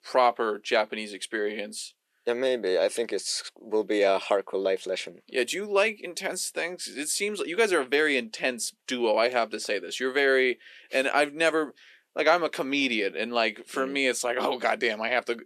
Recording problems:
thin; somewhat; fading below 300 Hz

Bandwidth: 13.5 kHz